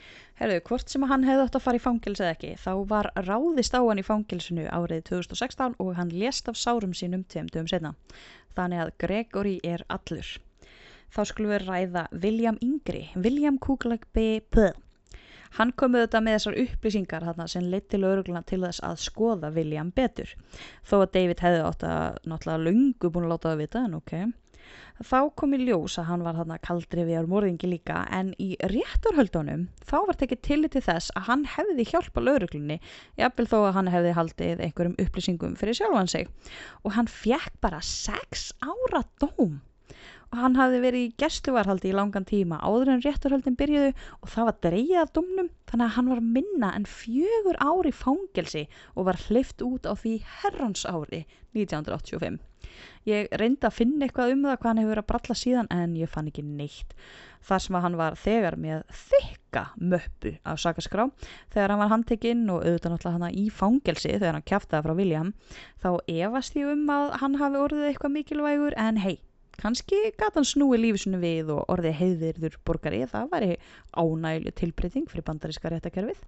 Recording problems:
high frequencies cut off; noticeable; nothing above 7.5 kHz

